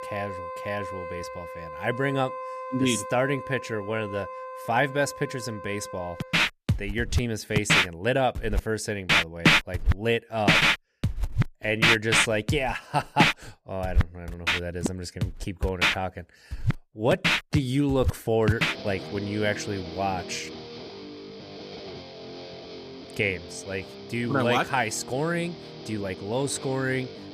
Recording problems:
background music; very loud; throughout; 2 dB above the speech

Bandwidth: 14.5 kHz